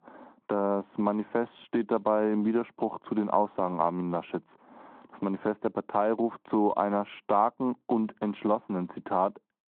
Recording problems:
phone-call audio; nothing above 3.5 kHz
muffled; very slightly; fading above 2.5 kHz

